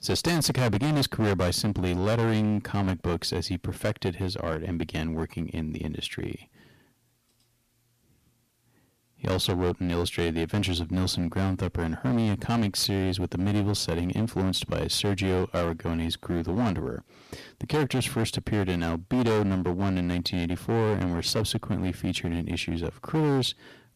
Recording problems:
distortion; heavy; 13% of the sound clipped

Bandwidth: 14.5 kHz